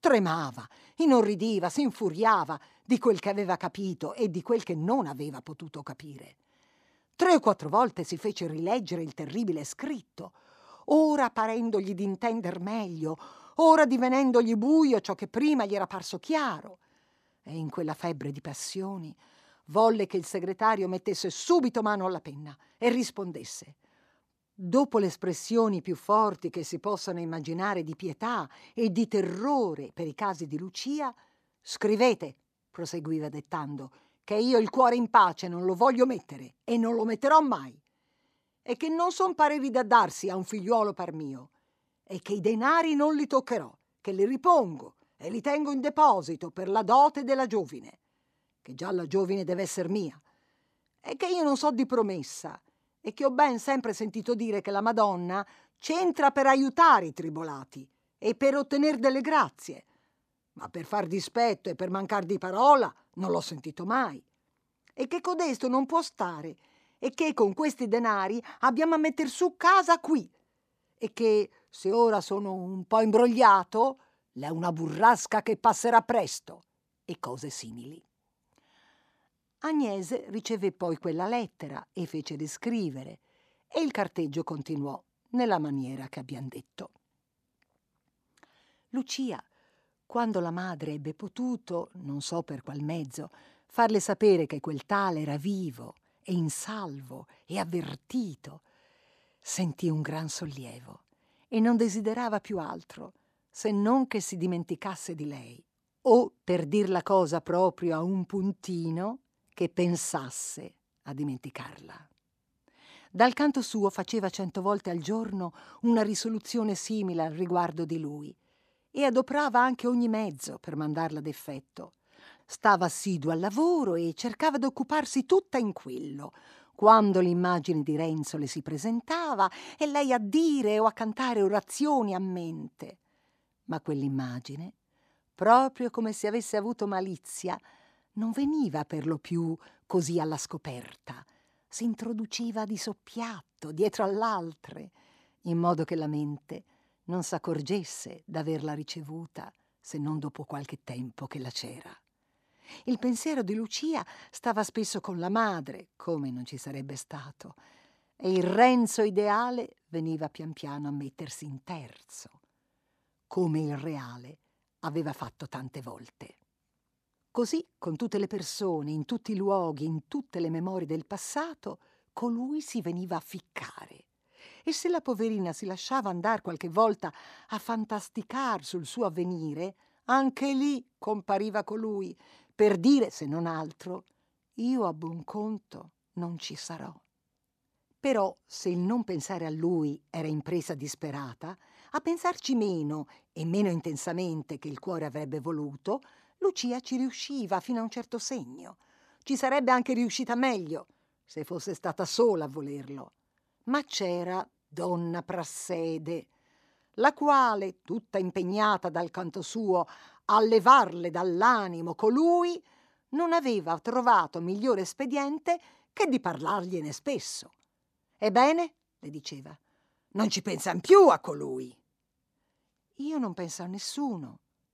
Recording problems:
none

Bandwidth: 14.5 kHz